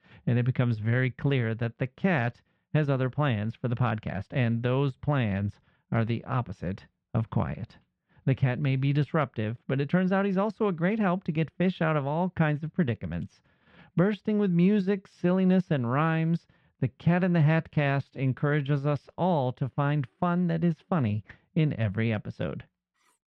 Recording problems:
muffled; slightly; fading above 2 kHz
clattering dishes; very faint; at 23 s; peak 40 dB below the speech

